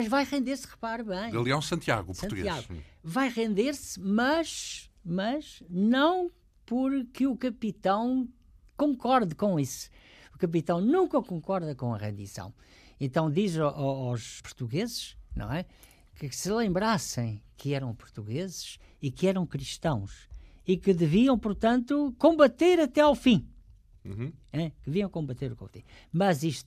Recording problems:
abrupt cut into speech; at the start

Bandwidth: 14.5 kHz